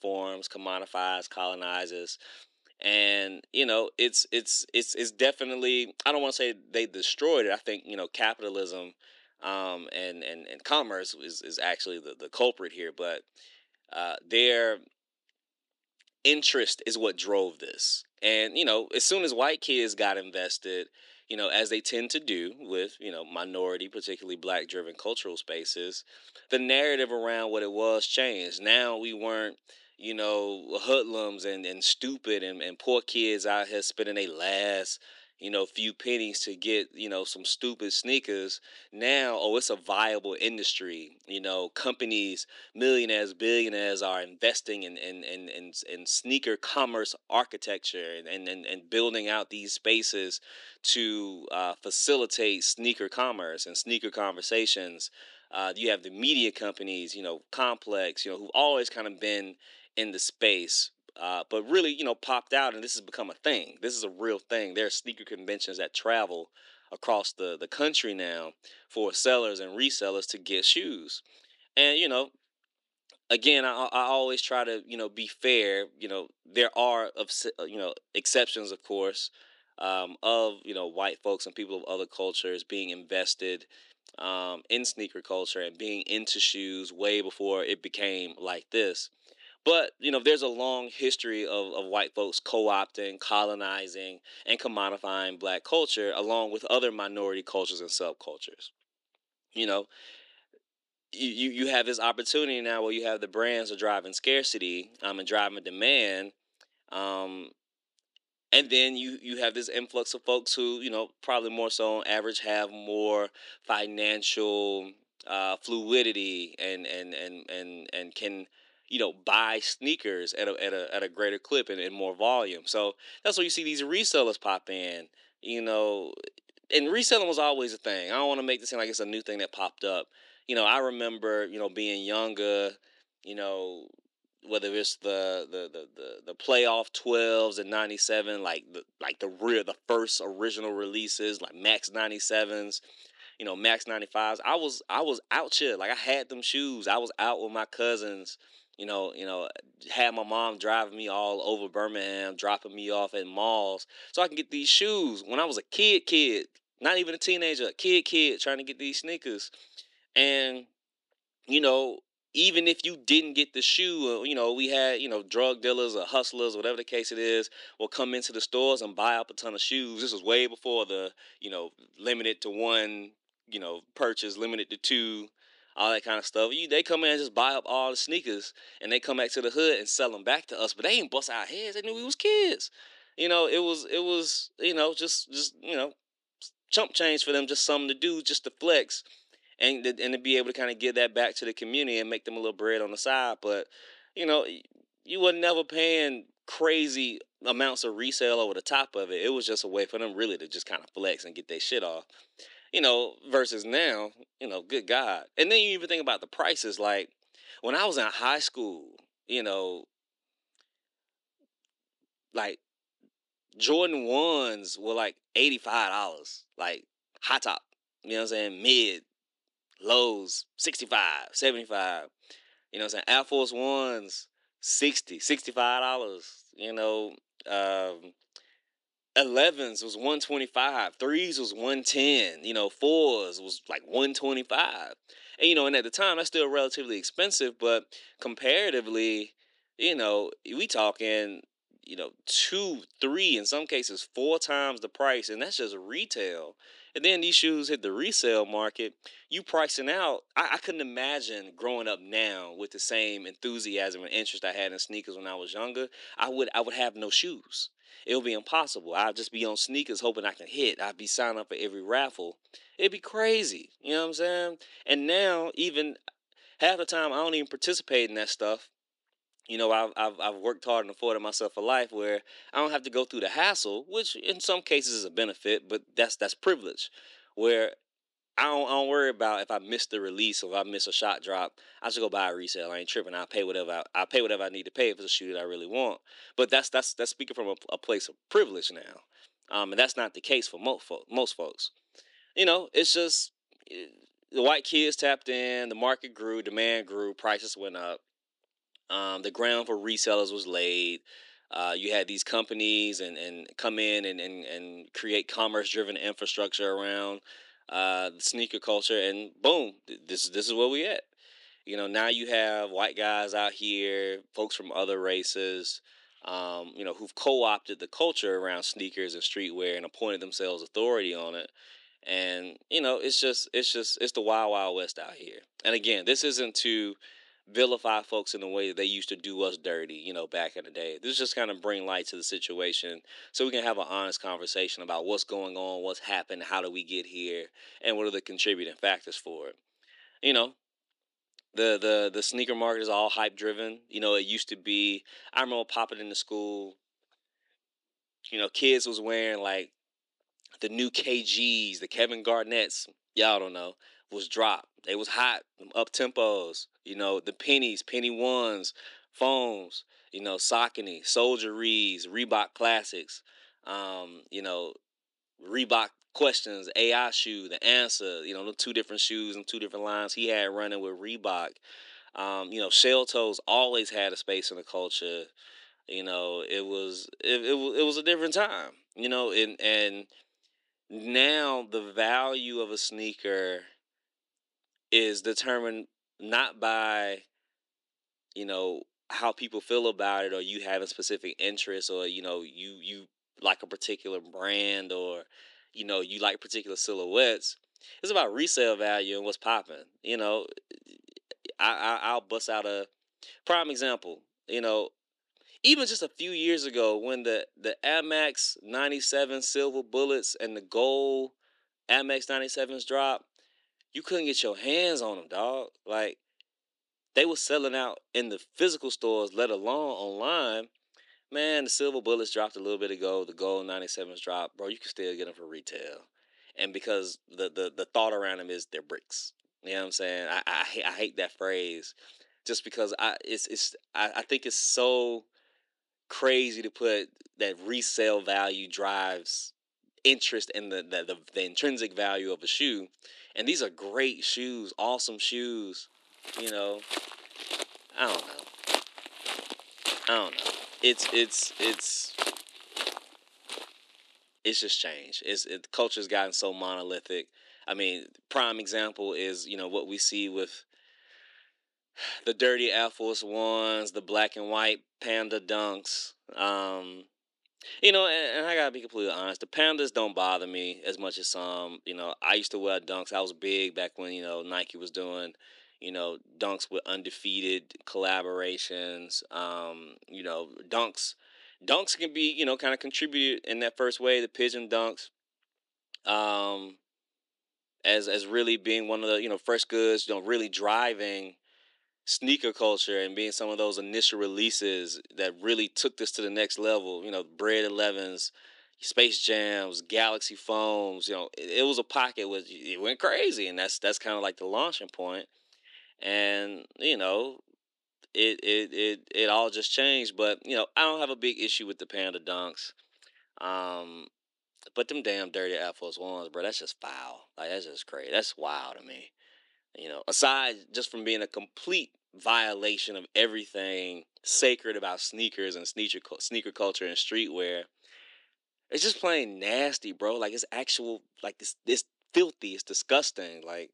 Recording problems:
thin; somewhat; fading below 300 Hz
footsteps; noticeable; from 7:26 to 7:34; peak 1 dB below the speech

